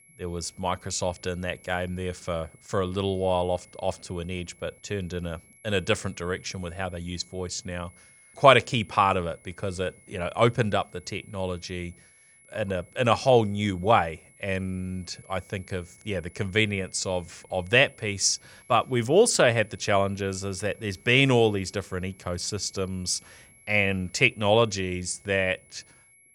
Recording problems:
high-pitched whine; faint; throughout; 2 kHz, 30 dB below the speech

